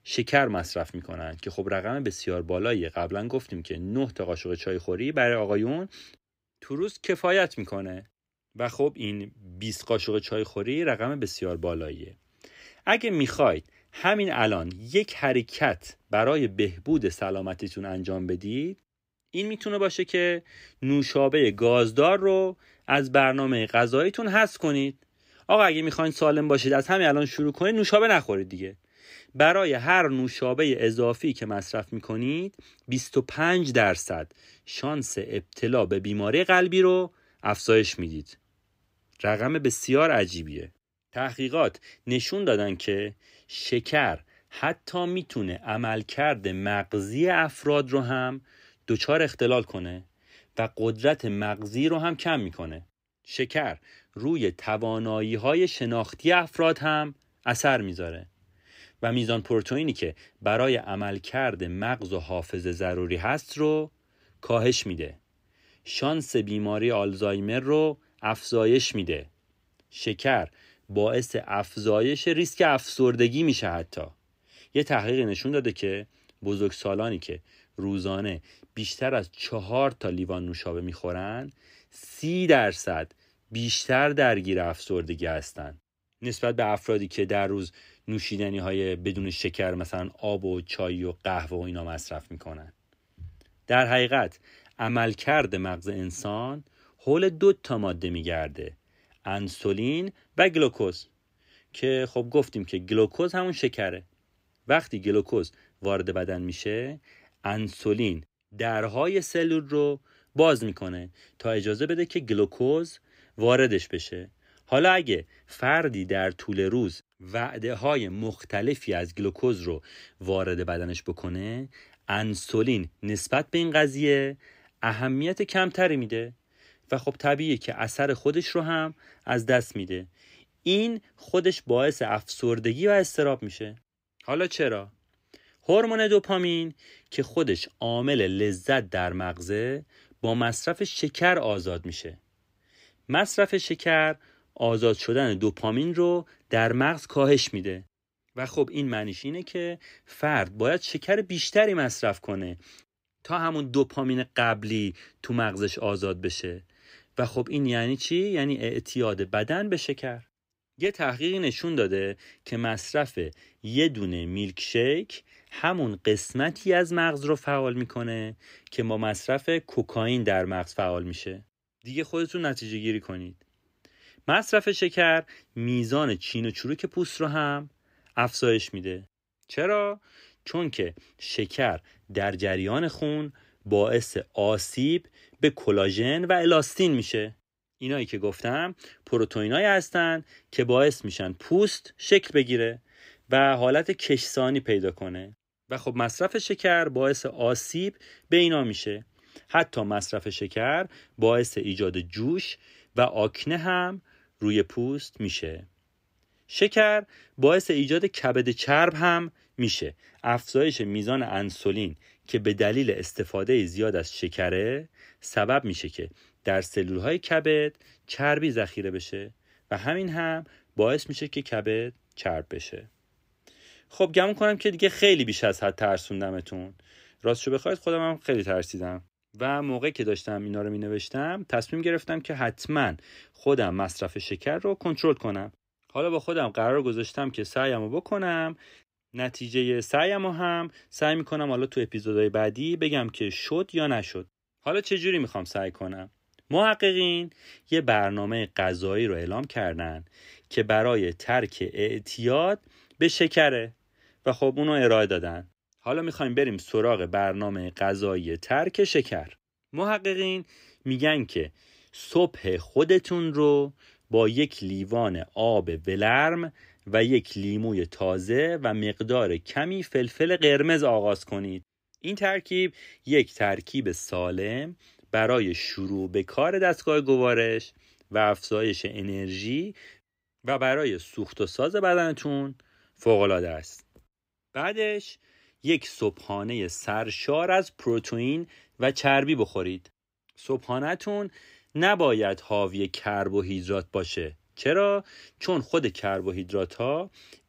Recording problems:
none

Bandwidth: 15.5 kHz